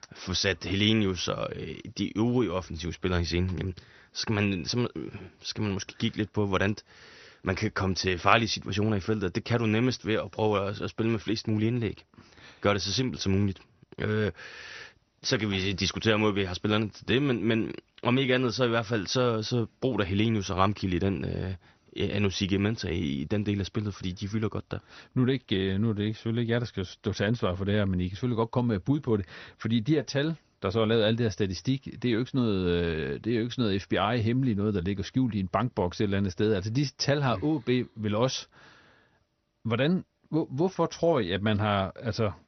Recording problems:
garbled, watery; slightly; nothing above 6 kHz

